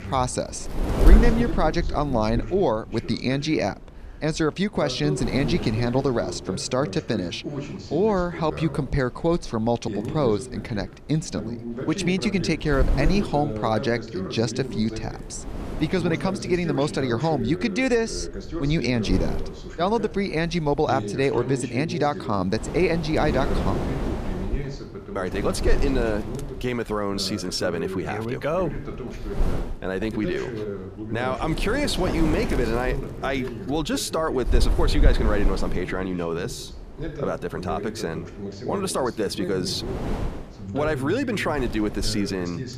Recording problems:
voice in the background; loud; throughout; 9 dB below the speech
wind noise on the microphone; occasional gusts; 10 dB below the speech

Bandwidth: 14.5 kHz